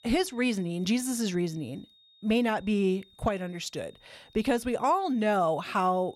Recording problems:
high-pitched whine; faint; throughout; 3.5 kHz, 30 dB below the speech

